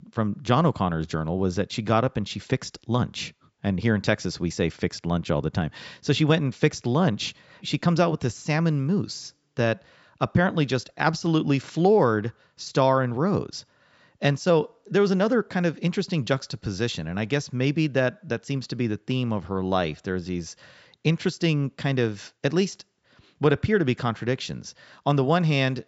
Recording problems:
high frequencies cut off; noticeable; nothing above 8 kHz

